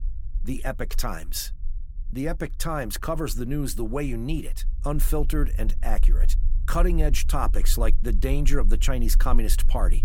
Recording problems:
low rumble; faint; throughout; 20 dB below the speech

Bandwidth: 17 kHz